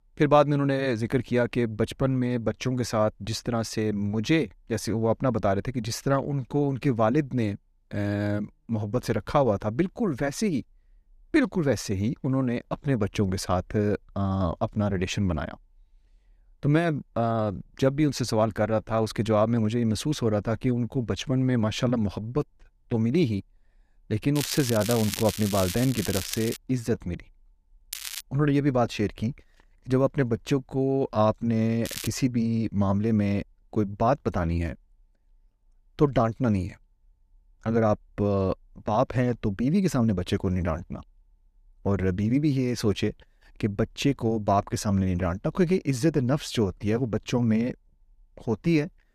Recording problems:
crackling; loud; from 24 to 27 s, at 28 s and at 32 s; 8 dB below the speech

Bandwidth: 14.5 kHz